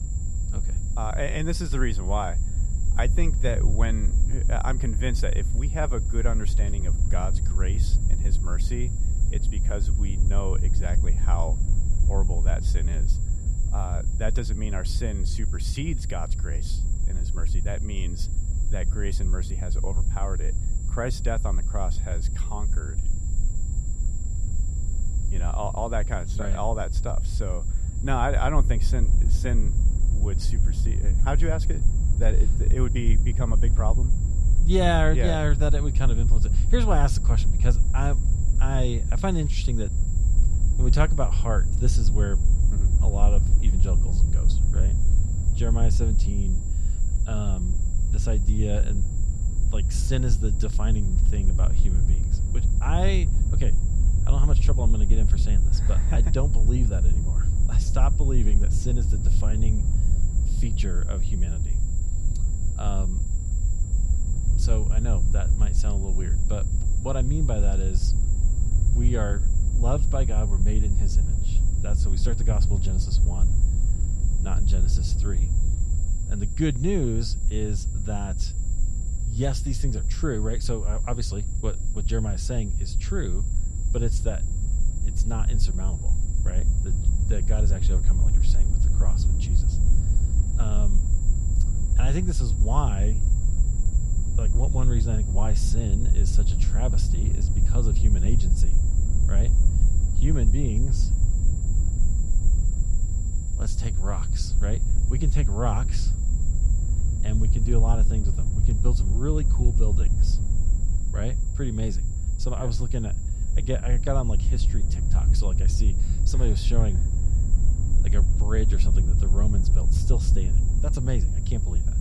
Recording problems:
wind noise on the microphone; heavy; 9 dB below the speech
high-pitched whine; noticeable; throughout; 7.5 kHz, 10 dB below the speech

